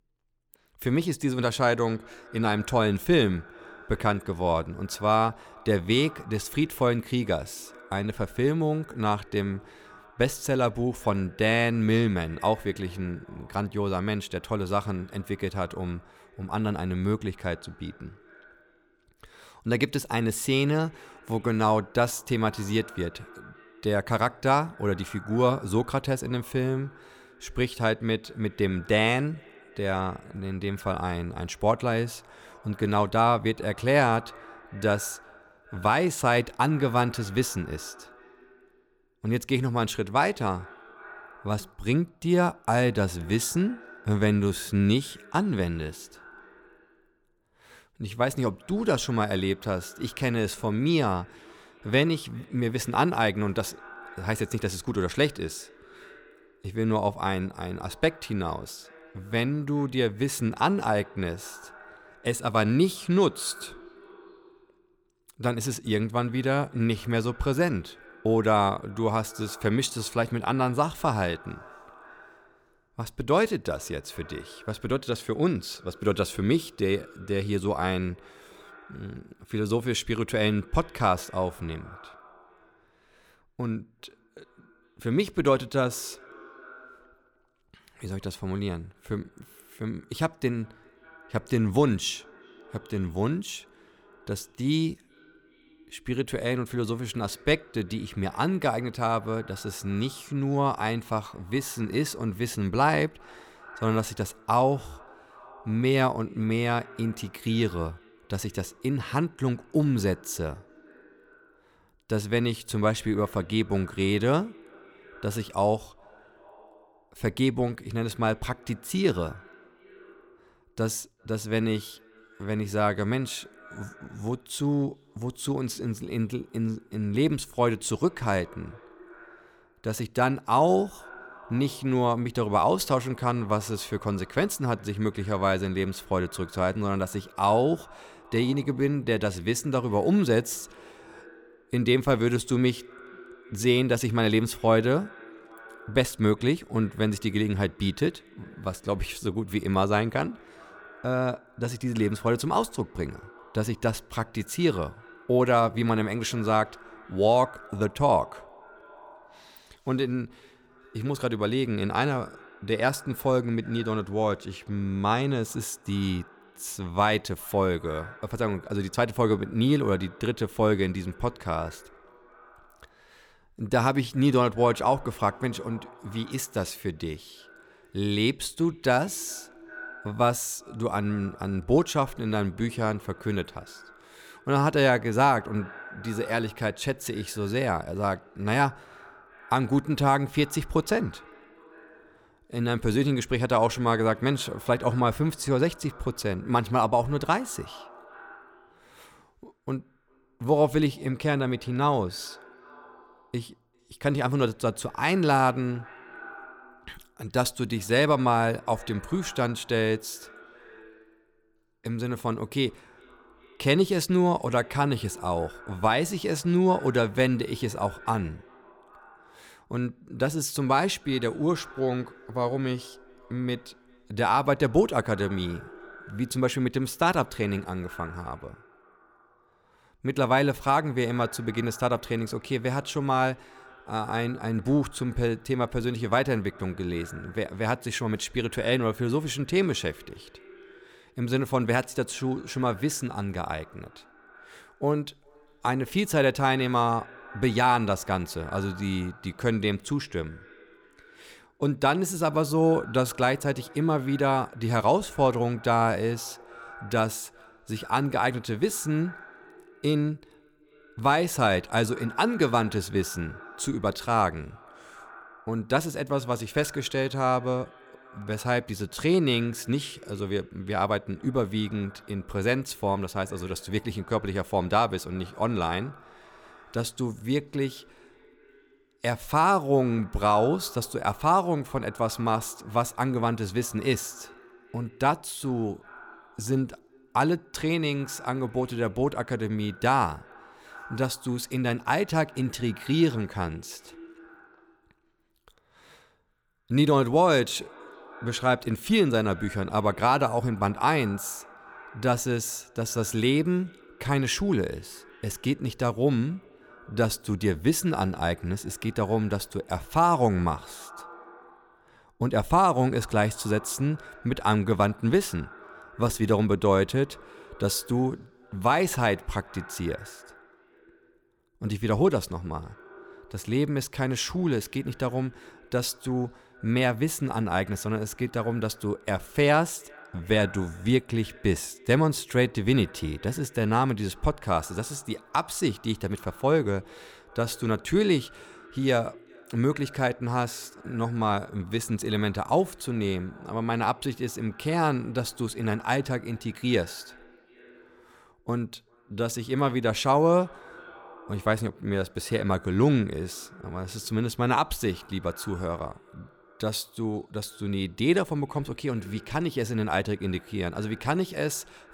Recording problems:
echo of what is said; faint; throughout; 400 ms later, 25 dB below the speech

